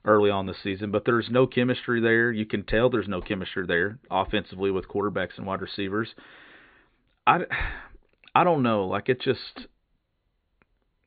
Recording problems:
high frequencies cut off; severe; nothing above 4.5 kHz

